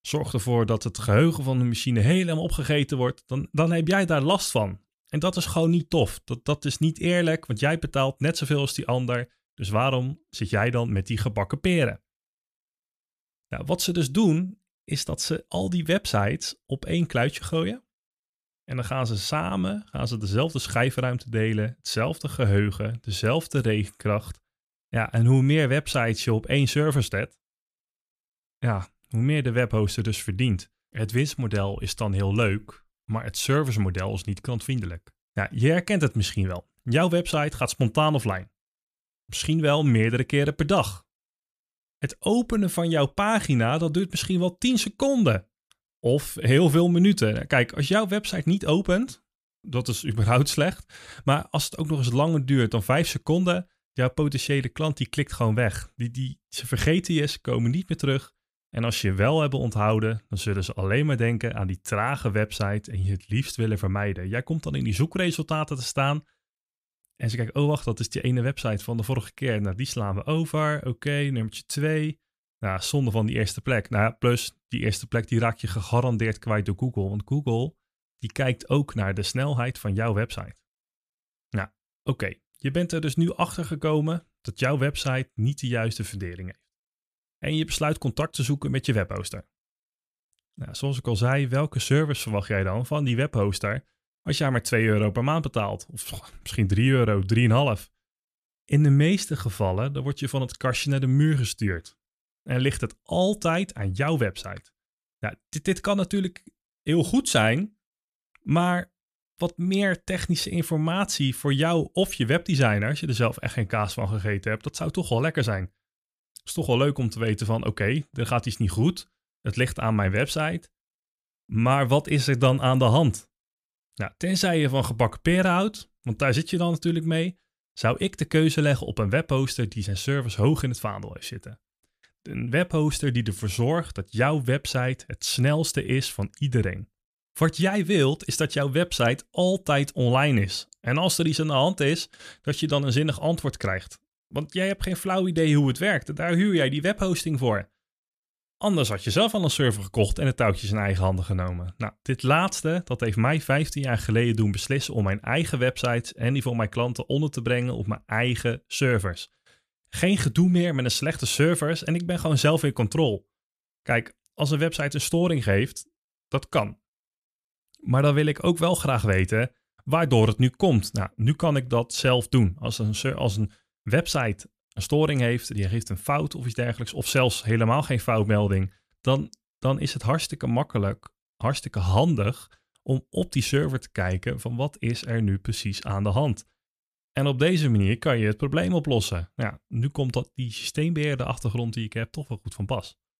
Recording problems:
none

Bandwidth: 14.5 kHz